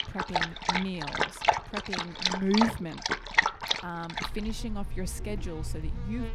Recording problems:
animal sounds; very loud; throughout; 4 dB above the speech

